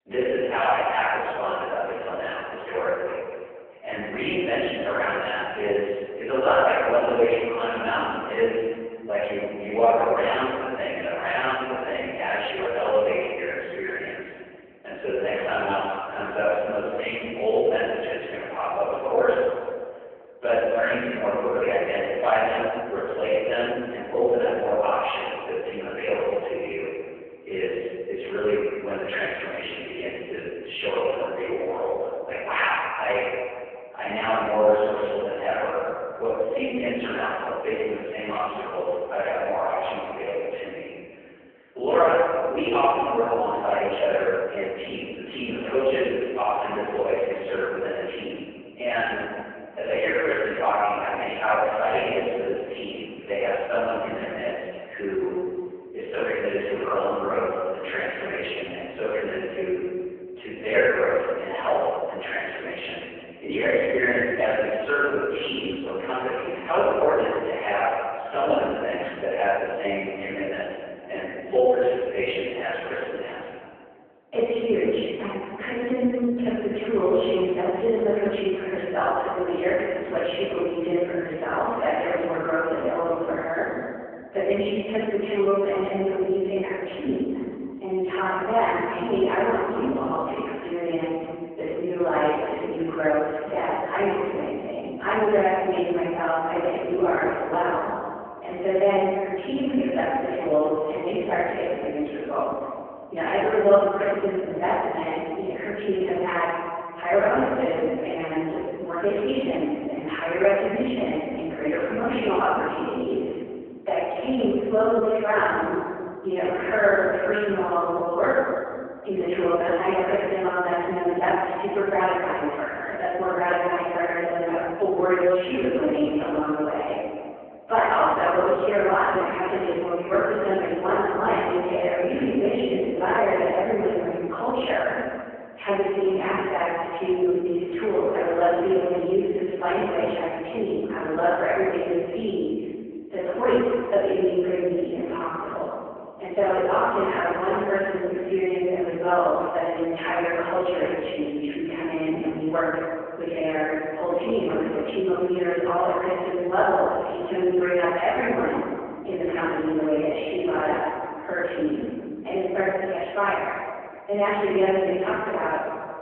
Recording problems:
phone-call audio; poor line
room echo; strong; dies away in 1.8 s
off-mic speech; far

